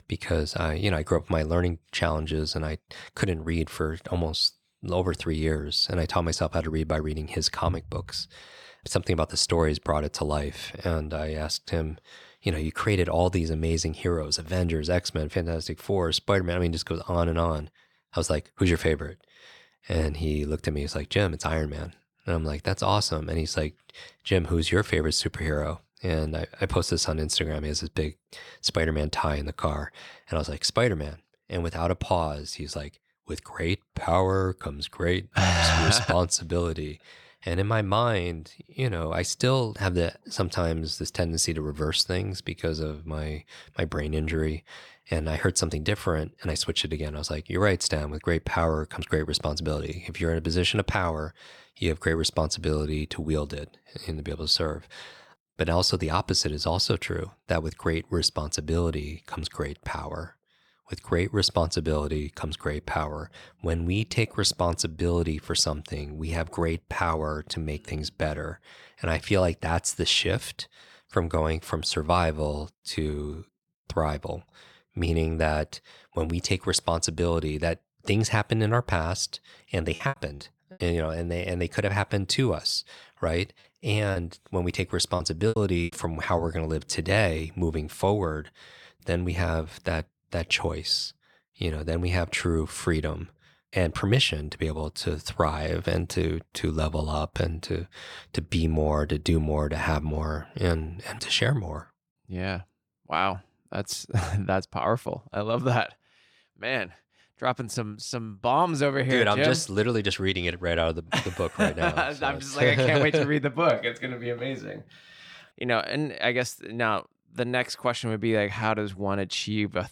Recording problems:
choppy; very; at 1:20 and from 1:24 to 1:26; 17% of the speech affected

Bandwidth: 18 kHz